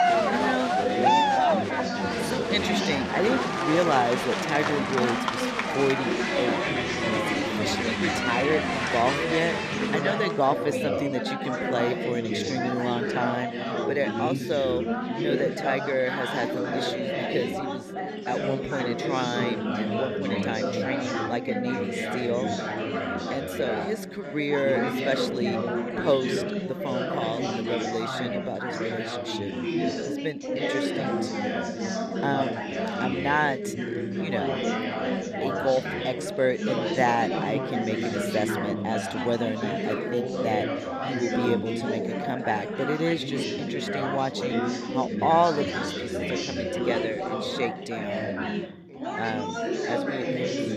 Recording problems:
chatter from many people; very loud; throughout; 1 dB above the speech

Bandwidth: 14 kHz